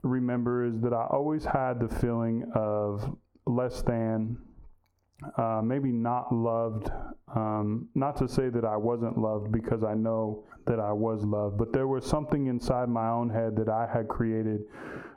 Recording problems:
squashed, flat; heavily
muffled; slightly; fading above 1.5 kHz

